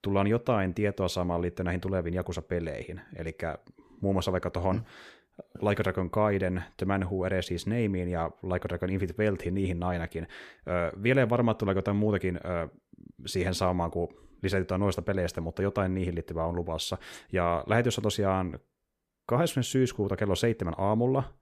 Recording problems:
none

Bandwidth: 14.5 kHz